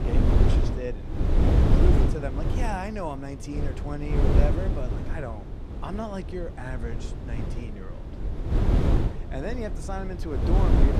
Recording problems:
wind noise on the microphone; heavy; as loud as the speech

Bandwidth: 14.5 kHz